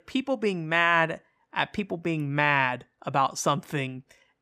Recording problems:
none

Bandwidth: 15 kHz